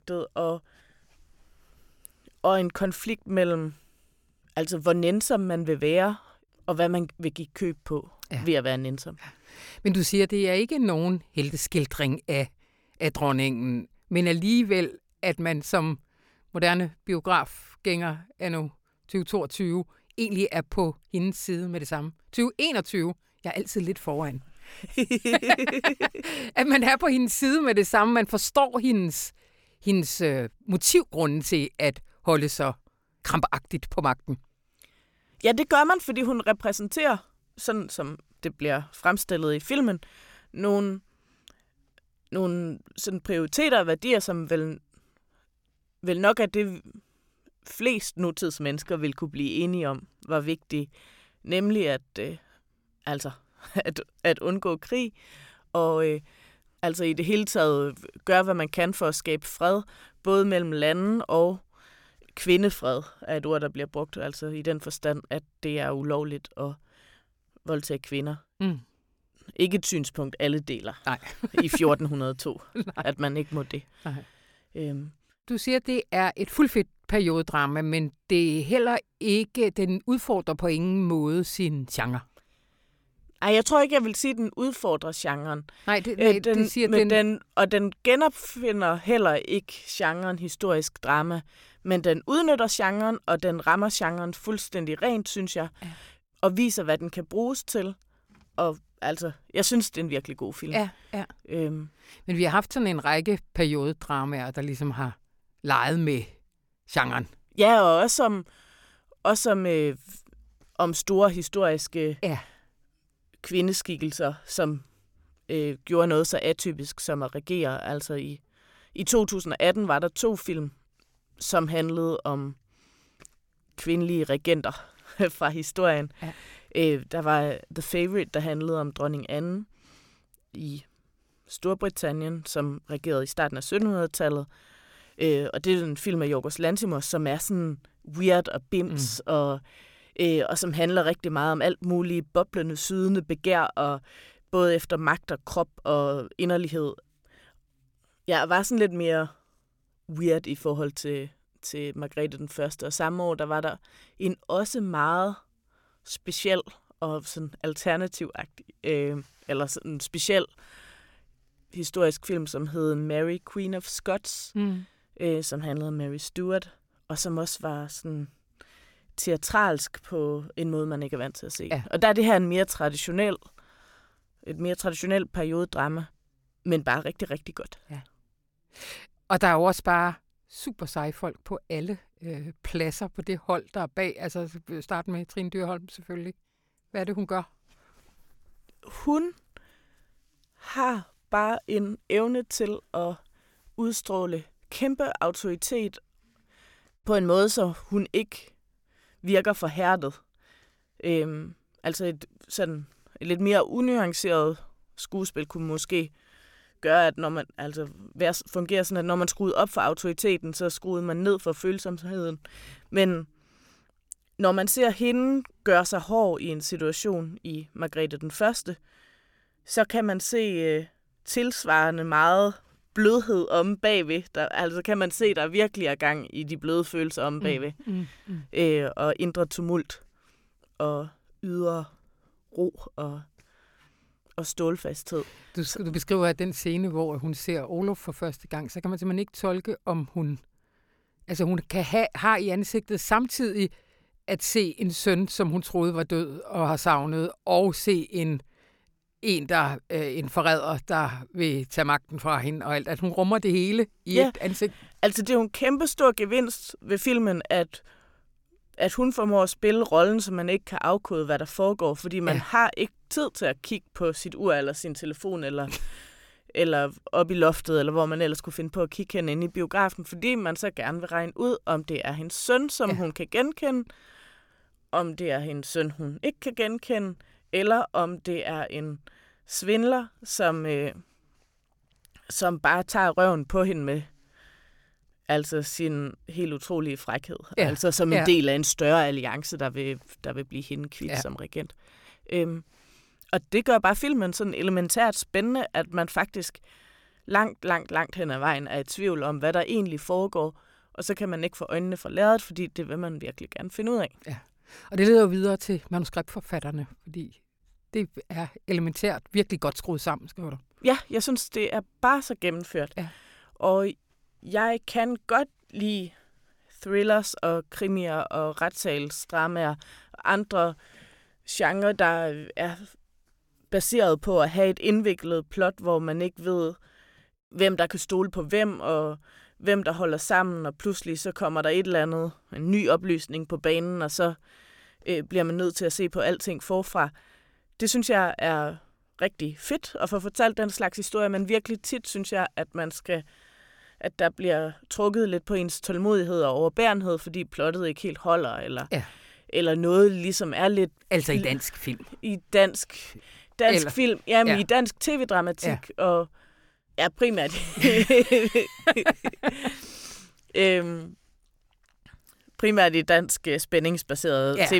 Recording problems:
abrupt cut into speech; at the end

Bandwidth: 17 kHz